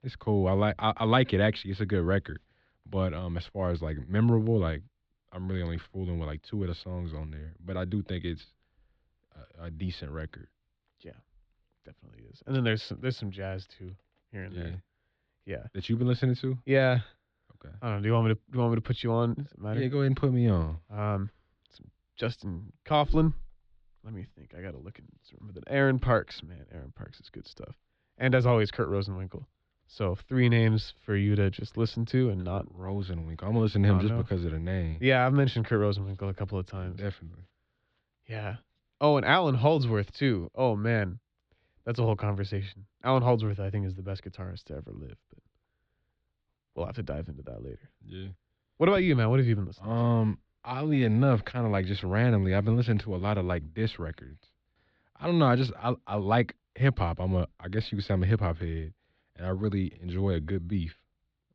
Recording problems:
muffled; slightly; fading above 4 kHz

